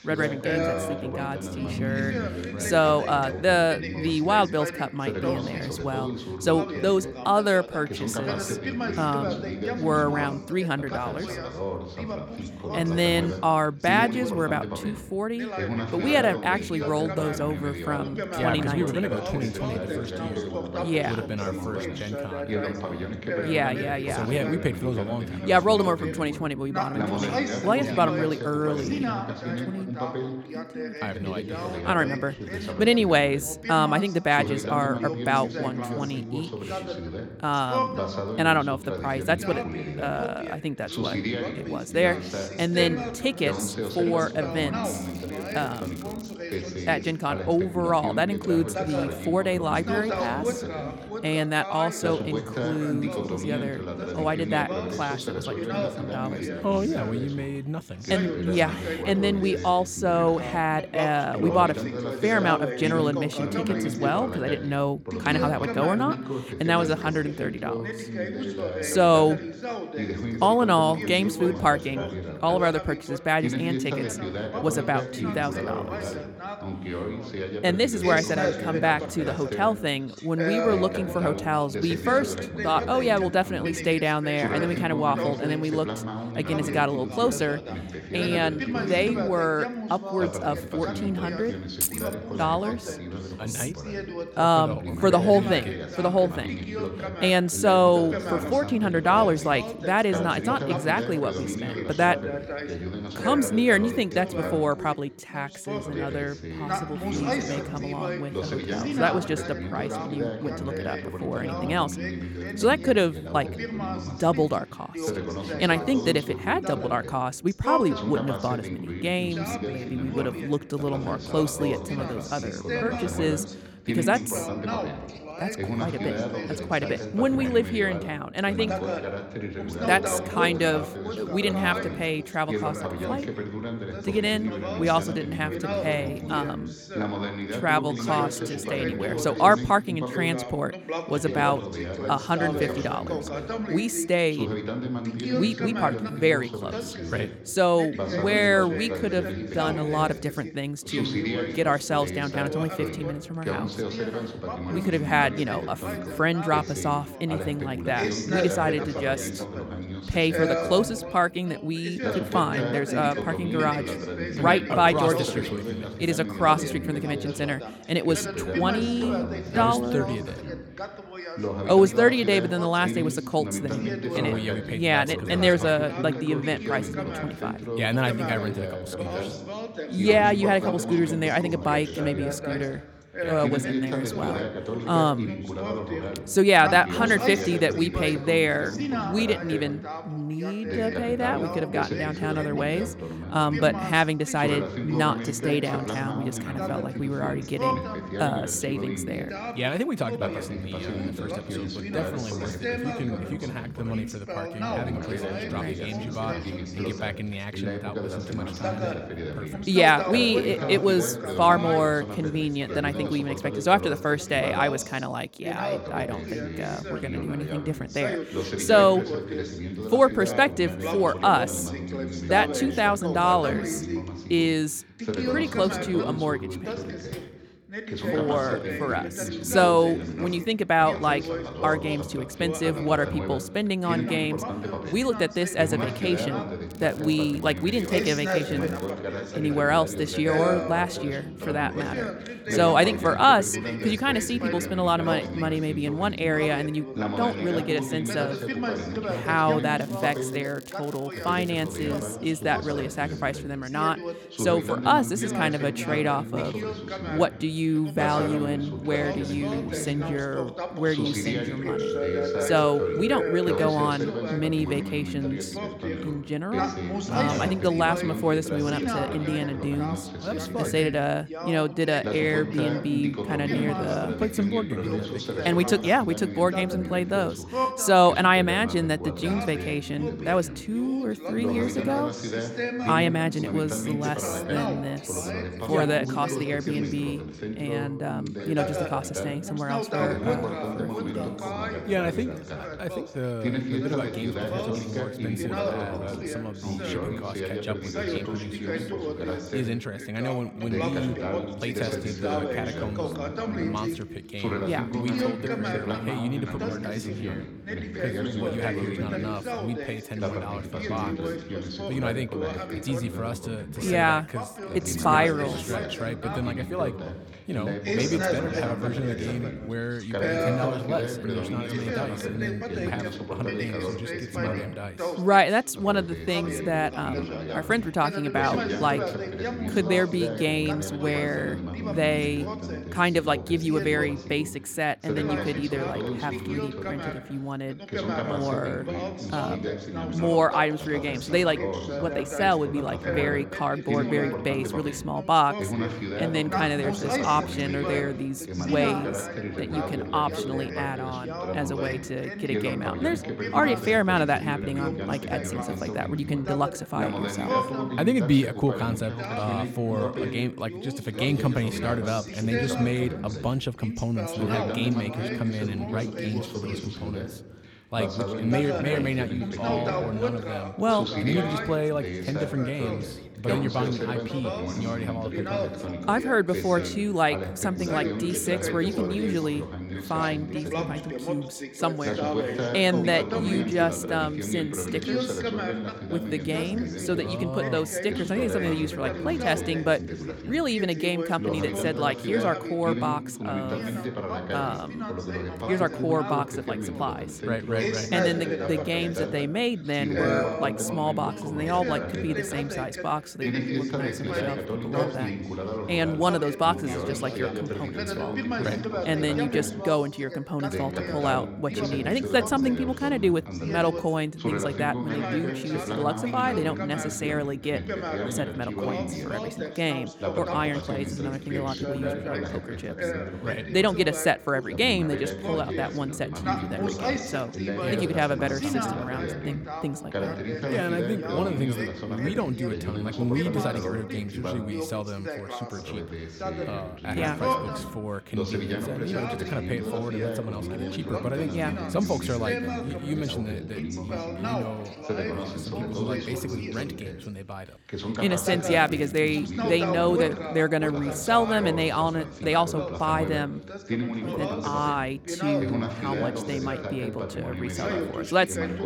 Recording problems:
background chatter; loud; throughout; 2 voices, 5 dB below the speech
crackling; faint; 4 times, first at 45 s; 20 dB below the speech
jangling keys; loud; at 1:32; peak level with the speech
door banging; faint; at 3:47; peak 15 dB below the speech
phone ringing; noticeable; from 4:22 to 4:24; peak 1 dB below the speech

